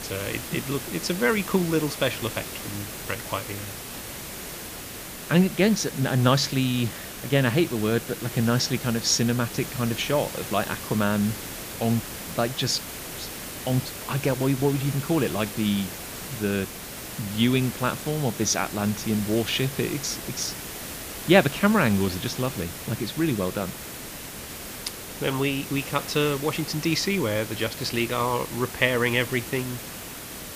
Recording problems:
hiss; loud; throughout; 9 dB below the speech

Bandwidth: 15 kHz